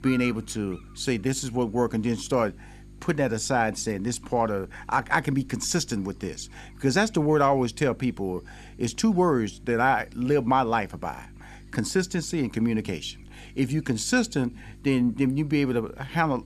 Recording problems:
electrical hum; faint; throughout; 50 Hz, 25 dB below the speech

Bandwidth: 13.5 kHz